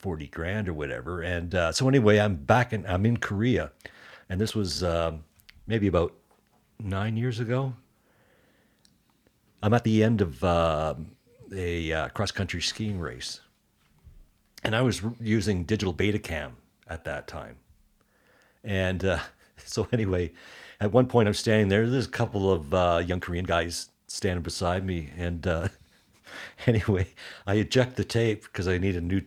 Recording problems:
uneven, jittery; strongly; from 1.5 to 28 s

